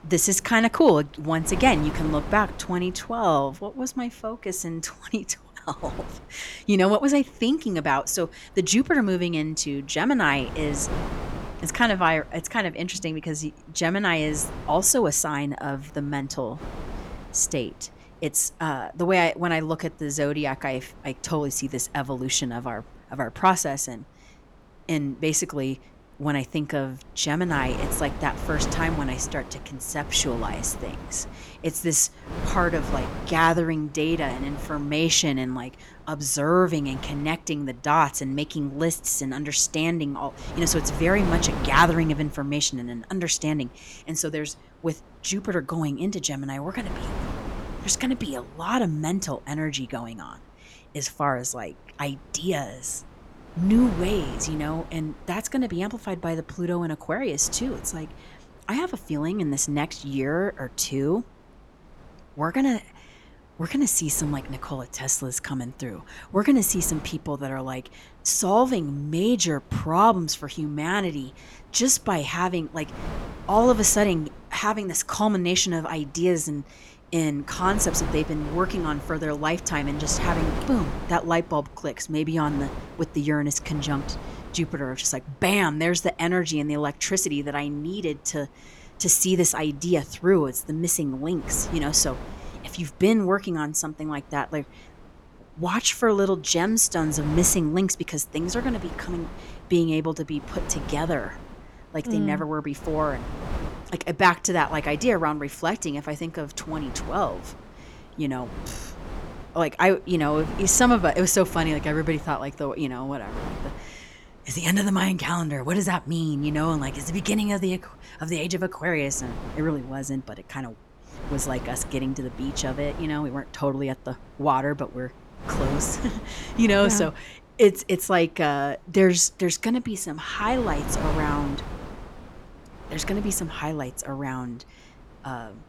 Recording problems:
wind noise on the microphone; occasional gusts; 15 dB below the speech

